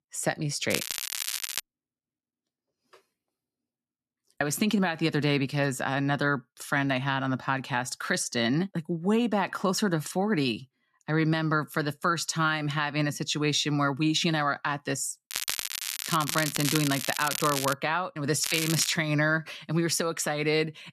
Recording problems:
crackling; loud; at 0.5 s, from 15 to 18 s and at 18 s; 4 dB below the speech

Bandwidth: 13.5 kHz